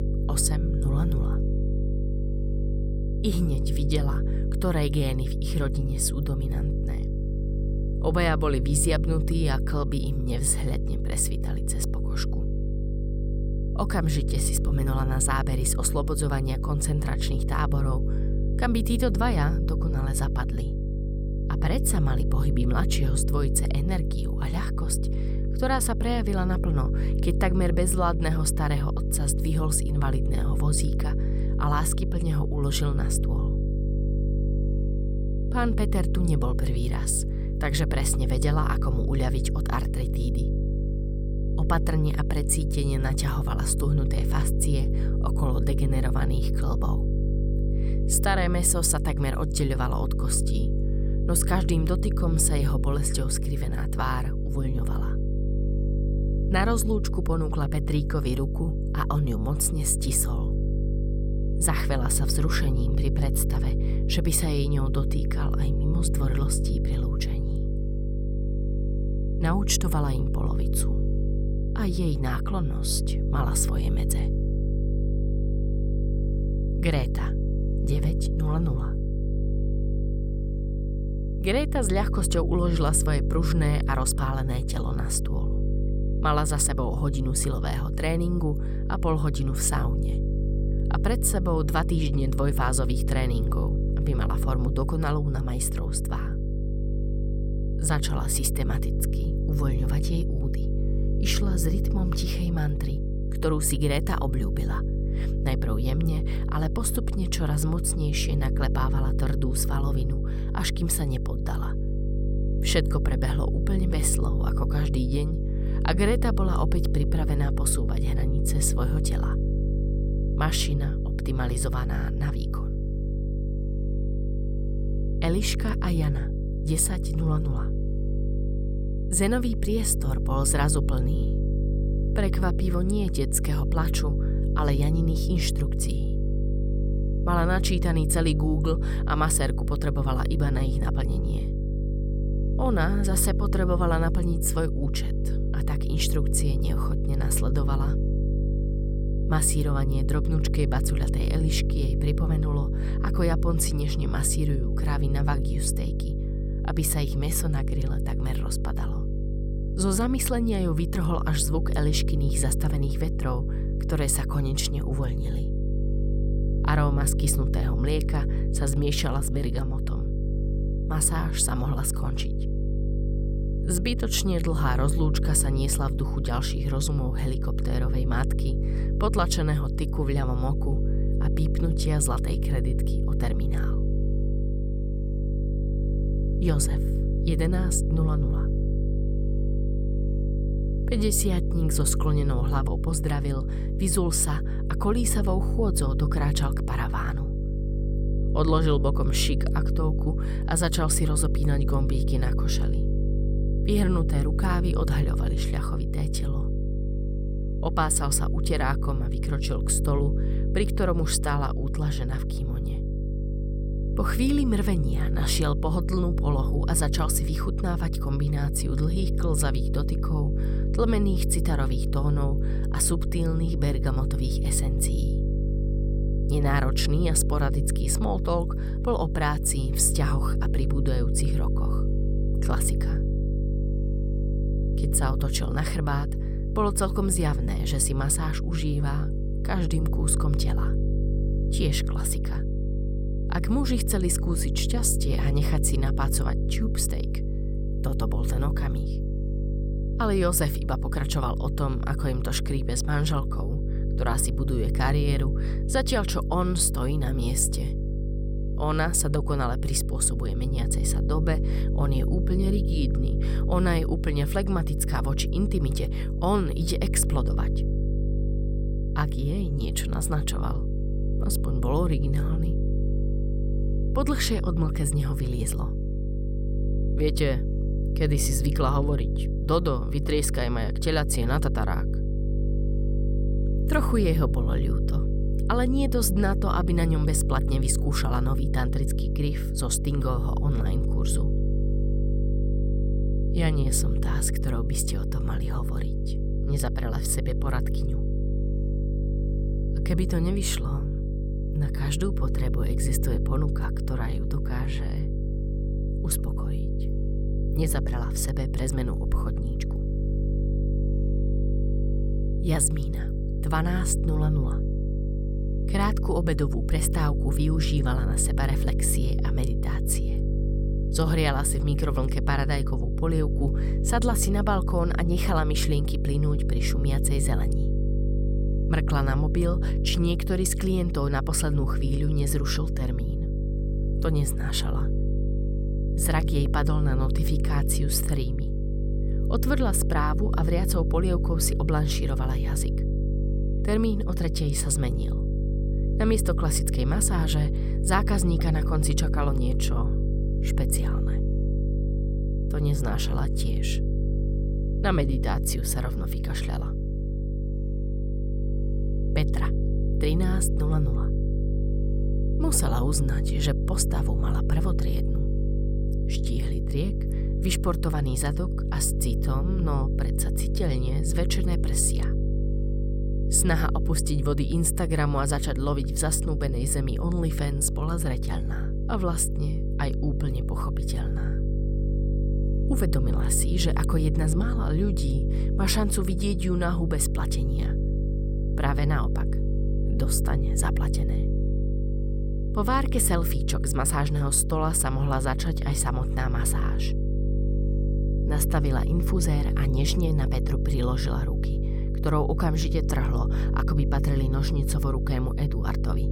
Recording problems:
electrical hum; loud; throughout; 50 Hz, 8 dB below the speech

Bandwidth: 16.5 kHz